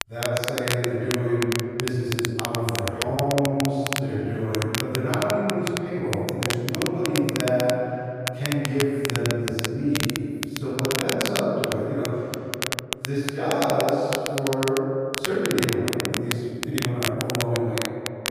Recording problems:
room echo; strong; dies away in 2.7 s
off-mic speech; far
crackle, like an old record; loud; 4 dB below the speech
uneven, jittery; strongly; from 1.5 to 17 s

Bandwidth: 14.5 kHz